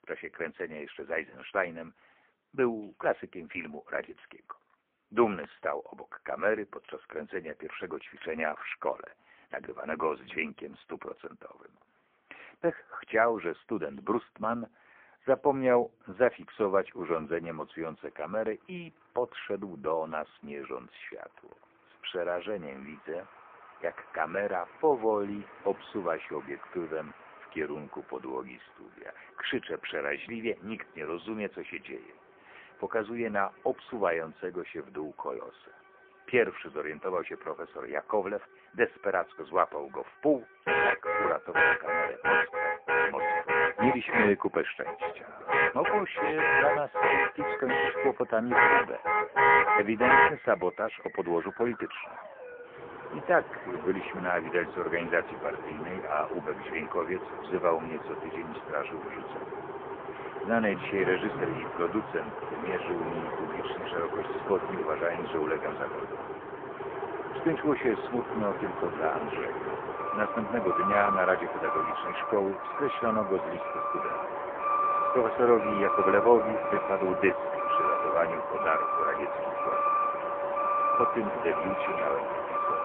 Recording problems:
phone-call audio; poor line
muffled; very; fading above 2 kHz
traffic noise; very loud; throughout; 2 dB above the speech
background music; noticeable; throughout; 20 dB below the speech

